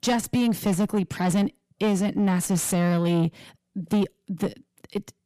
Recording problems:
distortion; slight; 10 dB below the speech

